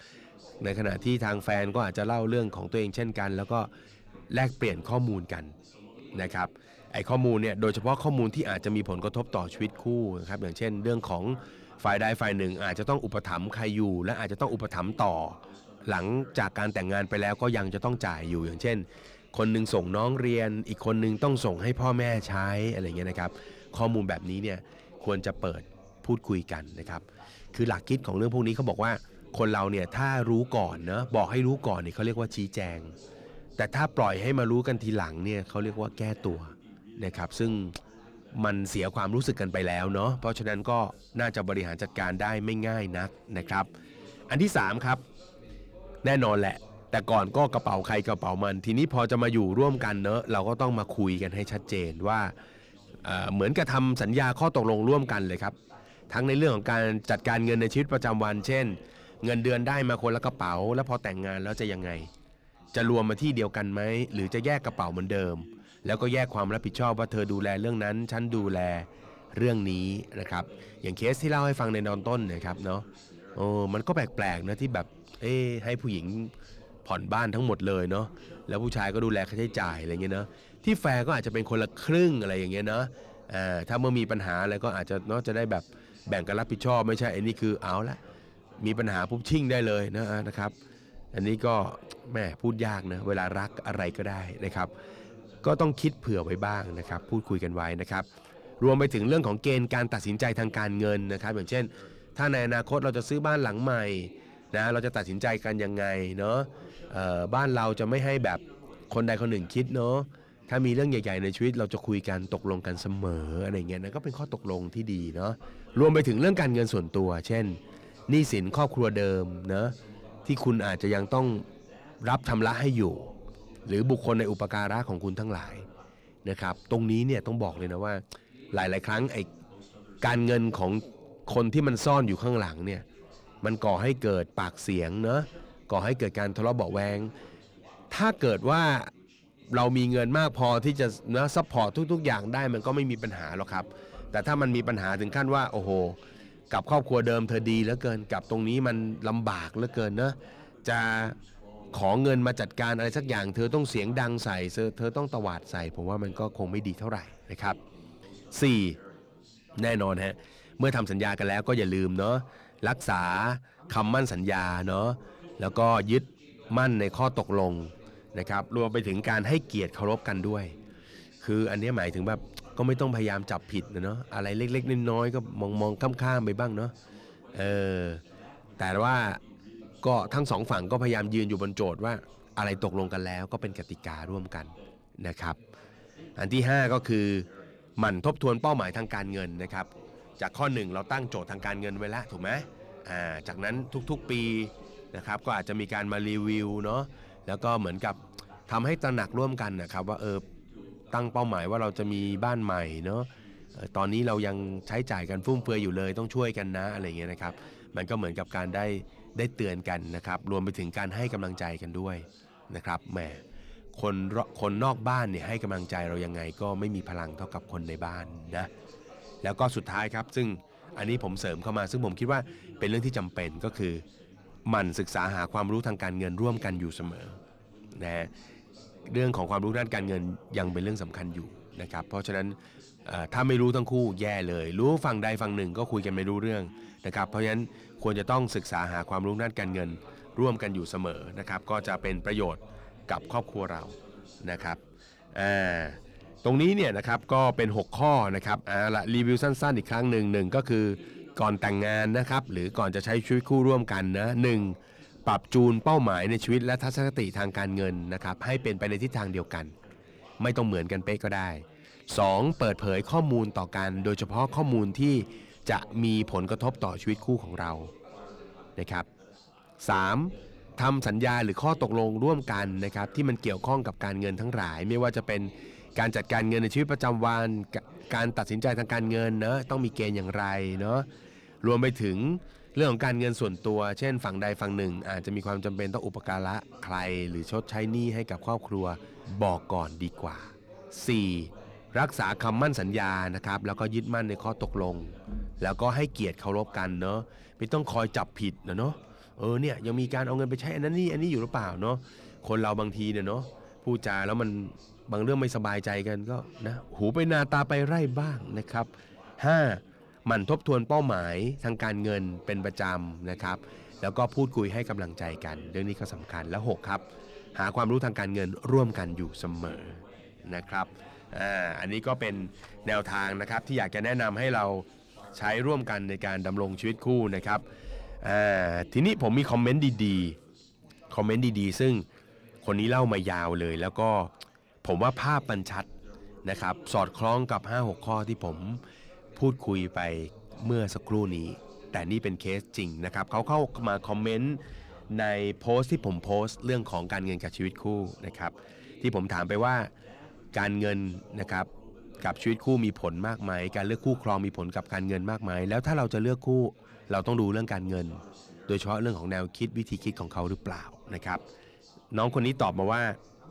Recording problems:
distortion; slight; 10 dB below the speech
background chatter; faint; throughout; 3 voices, 20 dB below the speech

